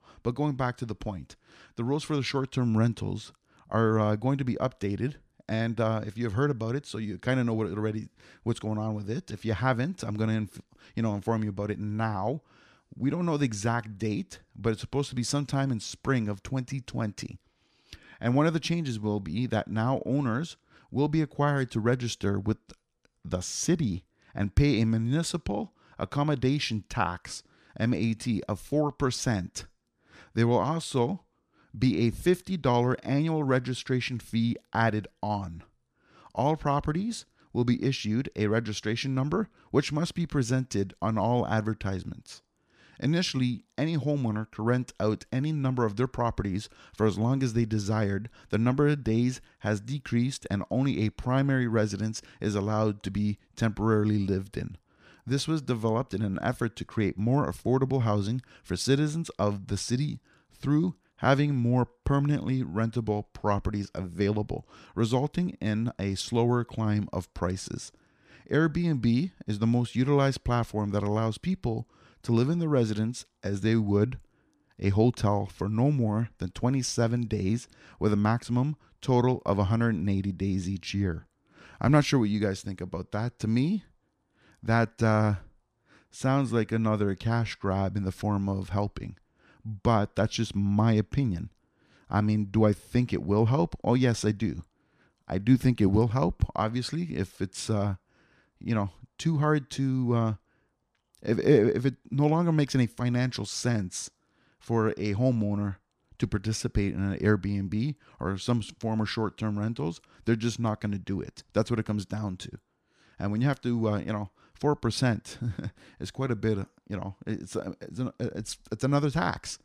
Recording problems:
none

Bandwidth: 14.5 kHz